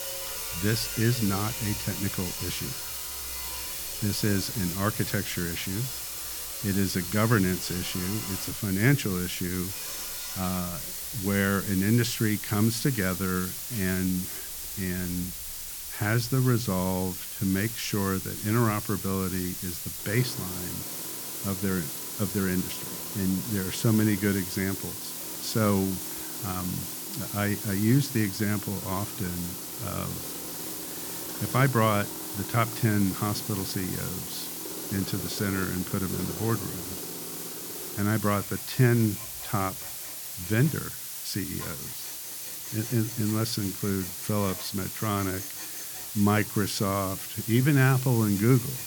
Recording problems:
hiss; loud; throughout; 5 dB below the speech
machinery noise; noticeable; throughout; 15 dB below the speech

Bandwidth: 18.5 kHz